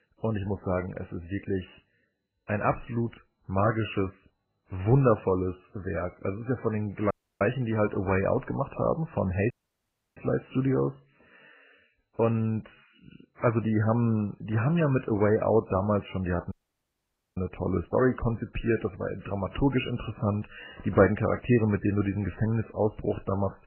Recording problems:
garbled, watery; badly; nothing above 3 kHz
audio cutting out; at 7 s, at 9.5 s for 0.5 s and at 17 s for 1 s

